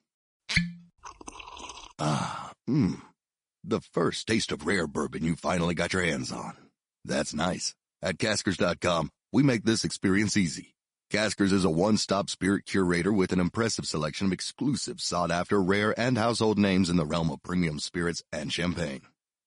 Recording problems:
garbled, watery; slightly; nothing above 10.5 kHz

